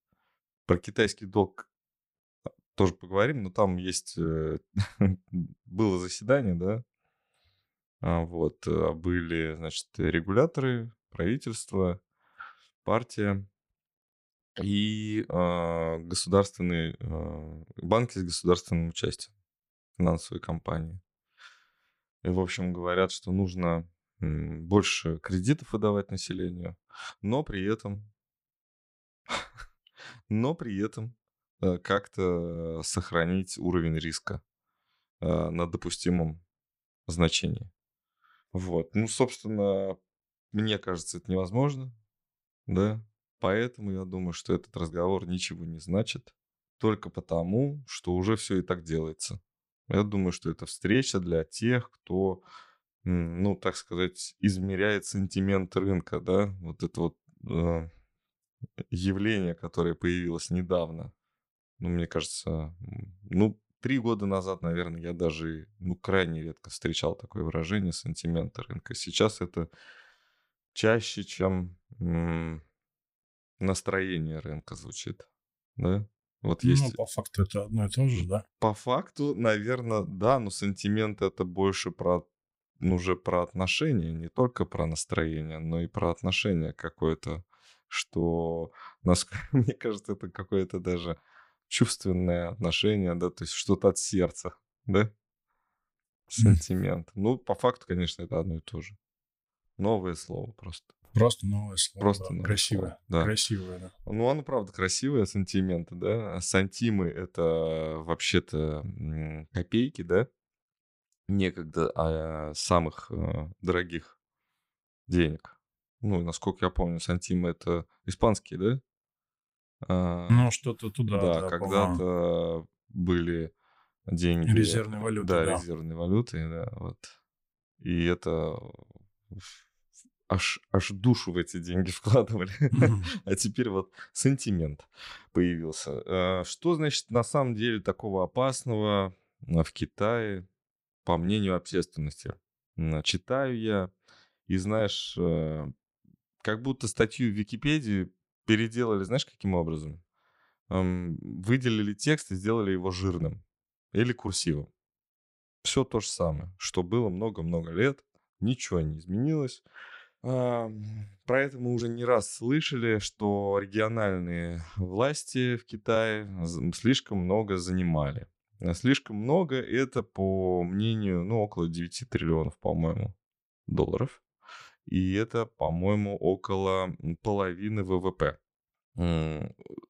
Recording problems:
none

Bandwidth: 15.5 kHz